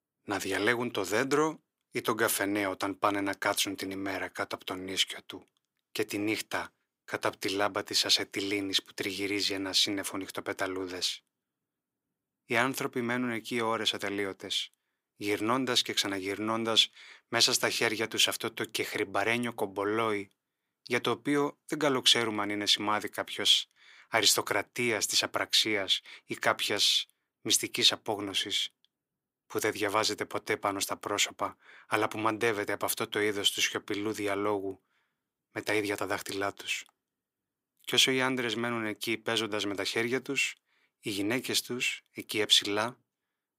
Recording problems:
thin; very; fading below 450 Hz

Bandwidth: 15.5 kHz